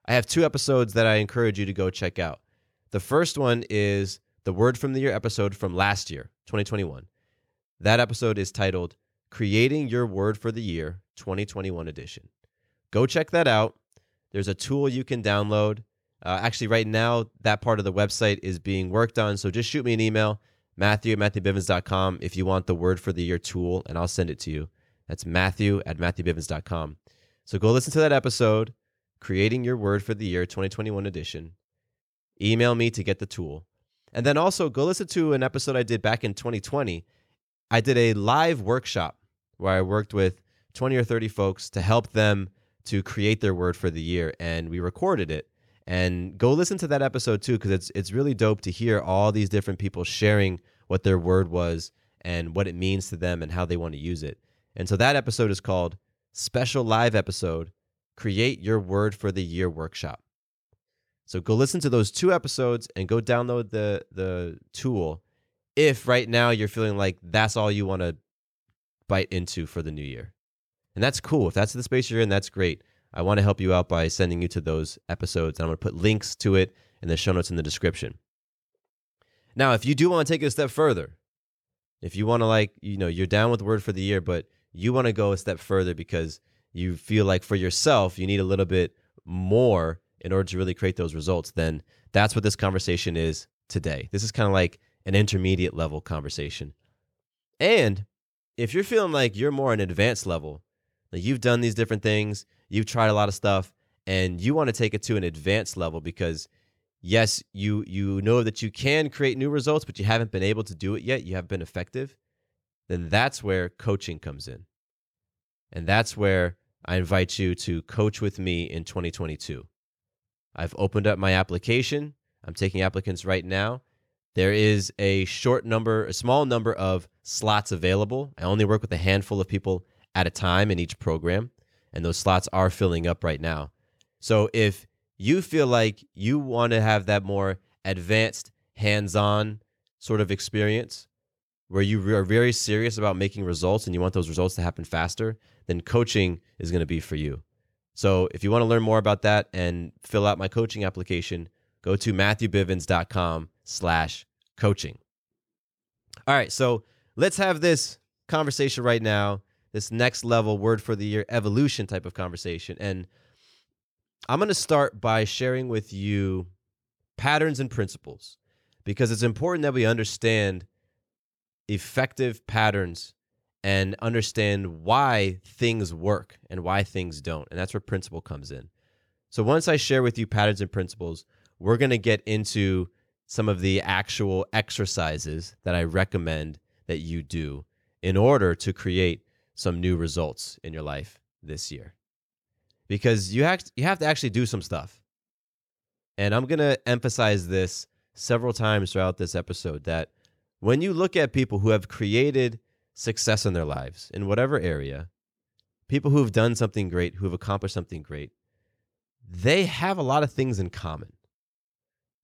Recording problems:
none

